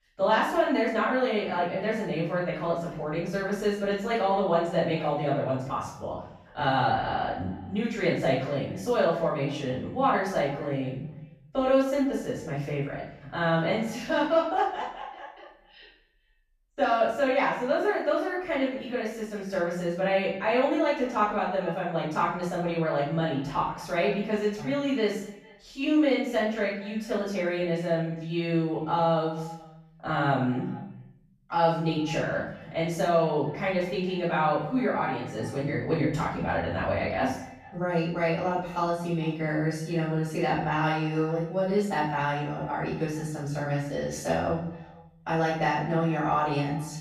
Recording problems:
off-mic speech; far
room echo; noticeable; dies away in 0.6 s
echo of what is said; faint; throughout; 220 ms later, 20 dB below the speech

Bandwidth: 15 kHz